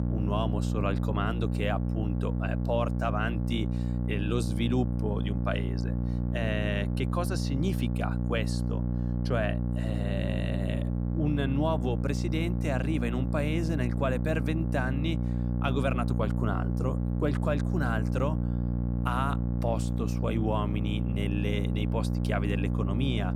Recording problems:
electrical hum; loud; throughout; 60 Hz, 6 dB below the speech

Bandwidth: 16 kHz